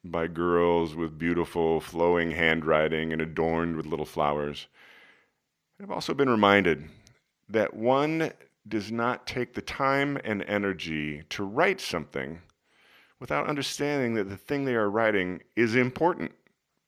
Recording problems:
none

